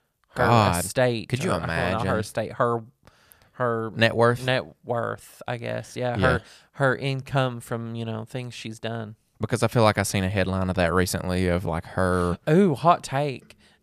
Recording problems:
none

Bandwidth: 14.5 kHz